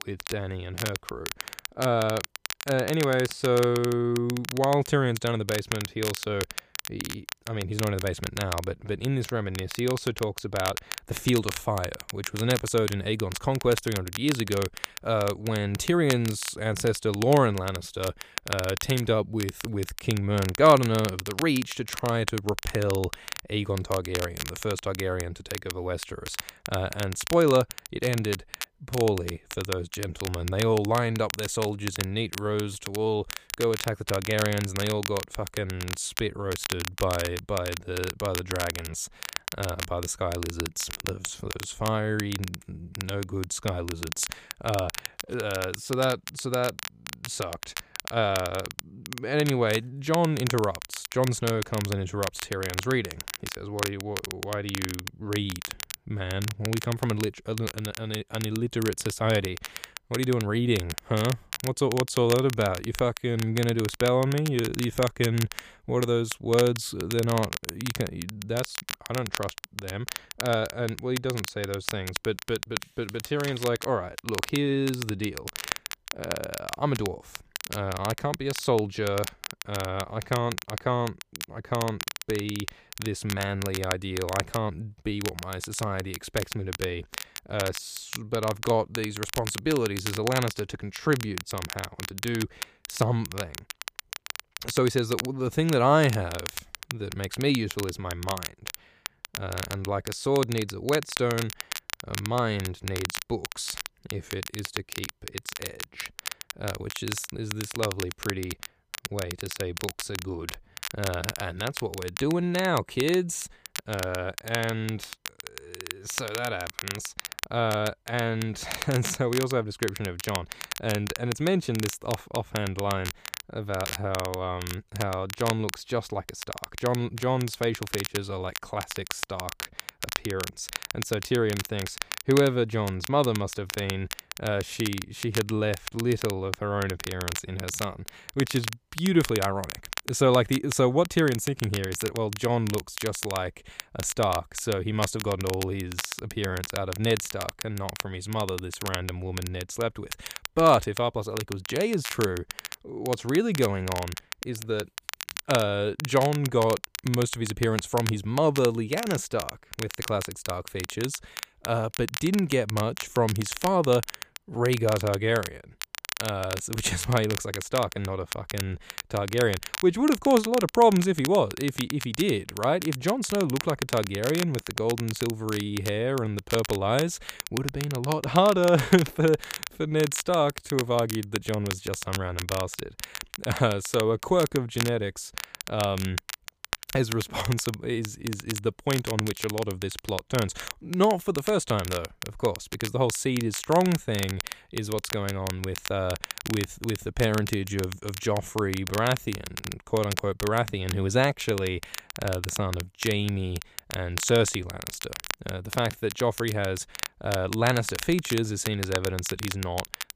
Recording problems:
crackle, like an old record; loud; 8 dB below the speech

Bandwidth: 15 kHz